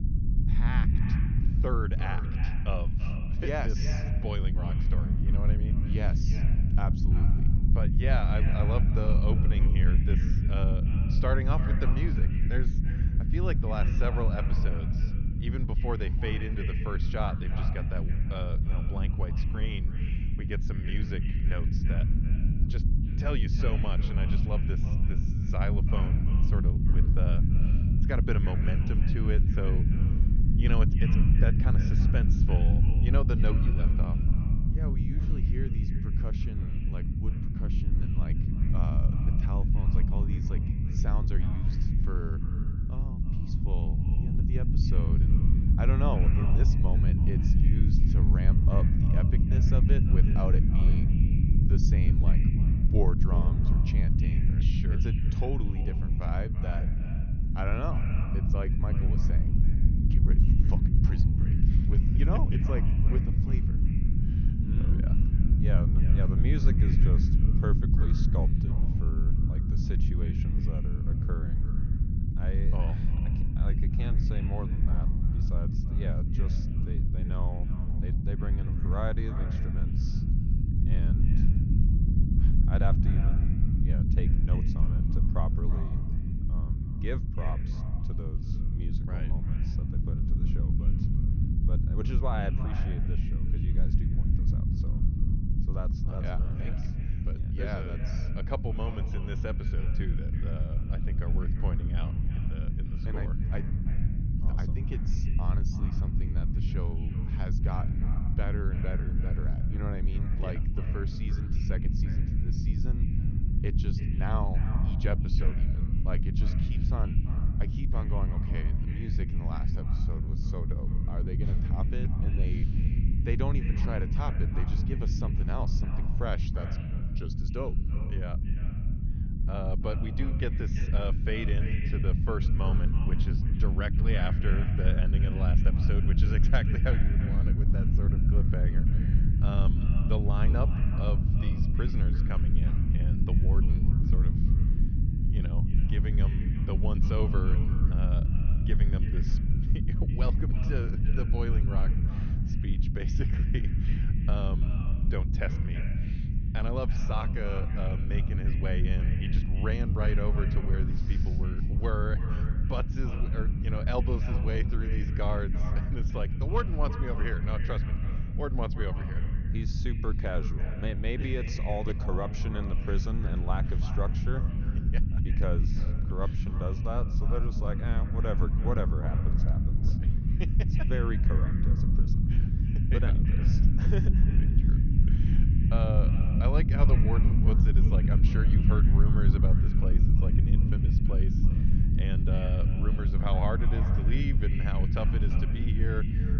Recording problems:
echo of what is said; strong; throughout; 330 ms later, 10 dB below the speech
high frequencies cut off; noticeable; nothing above 6.5 kHz
low rumble; loud; throughout; 2 dB below the speech

